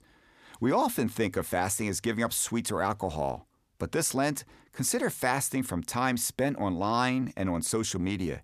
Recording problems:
none

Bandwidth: 14.5 kHz